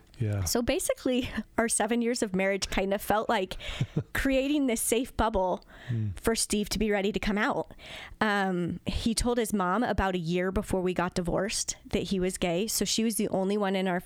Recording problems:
squashed, flat; heavily

